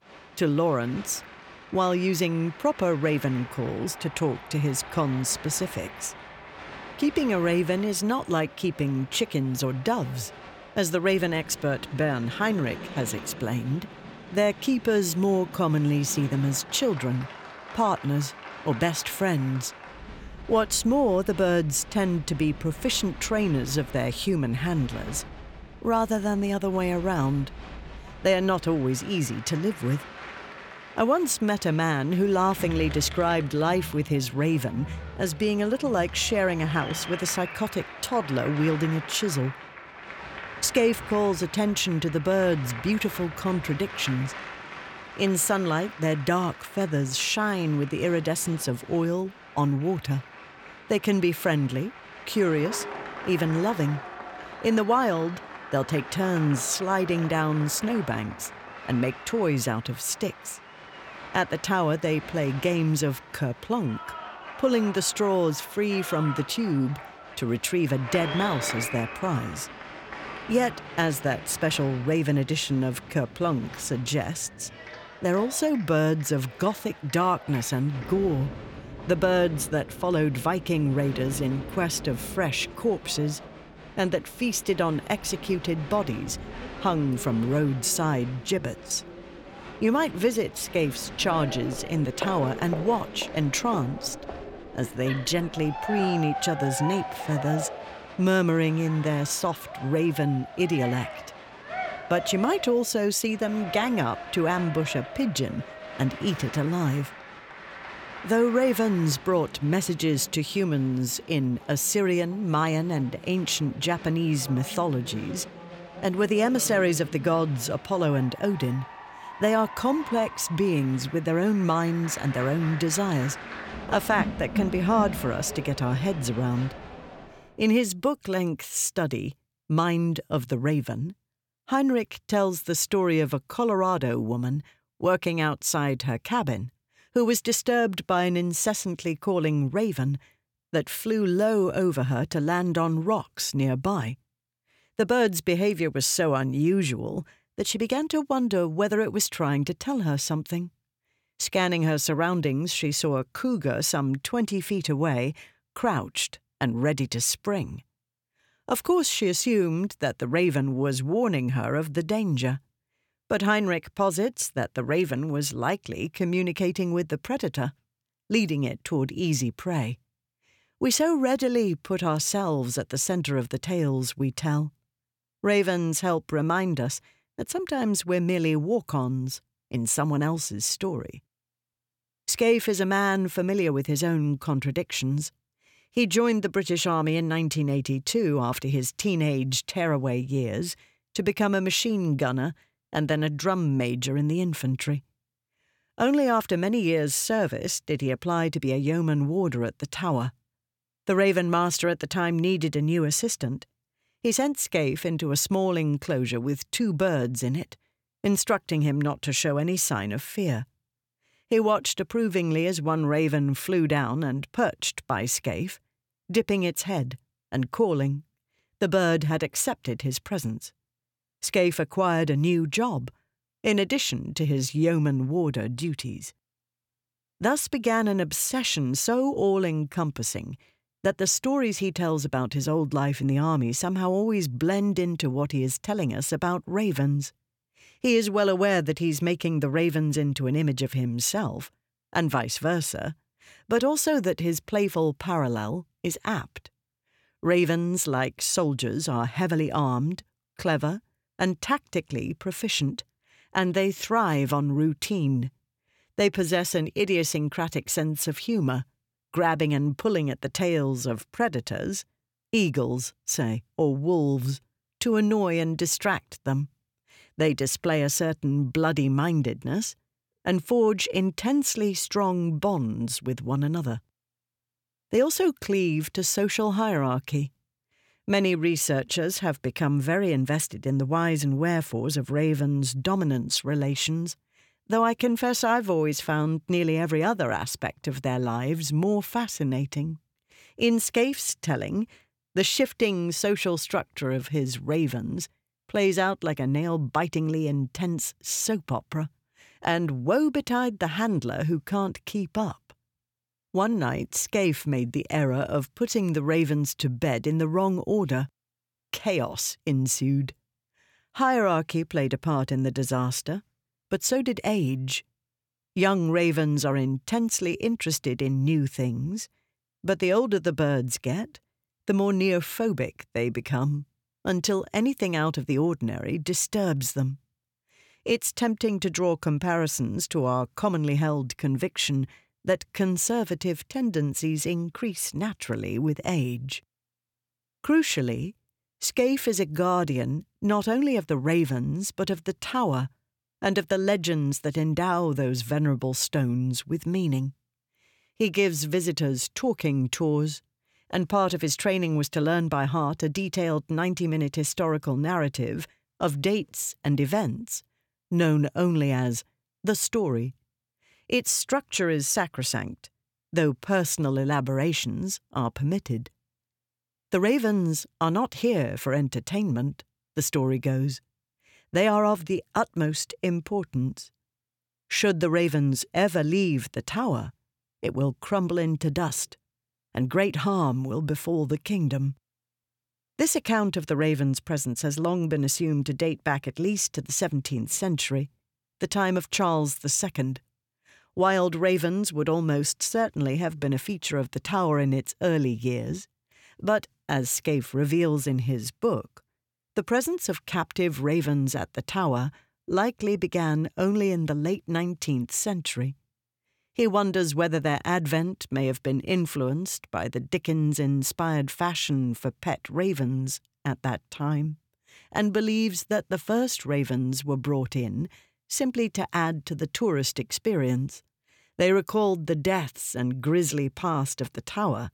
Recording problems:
crowd noise; noticeable; until 2:07; 15 dB below the speech

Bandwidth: 17 kHz